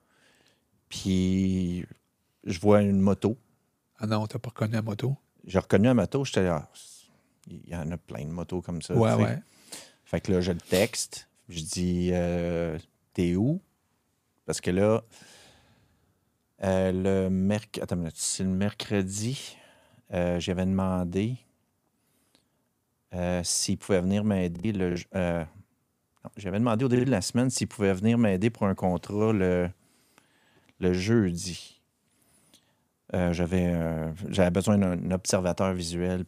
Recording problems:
choppy; occasionally; from 25 to 27 s; 4% of the speech affected

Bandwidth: 15 kHz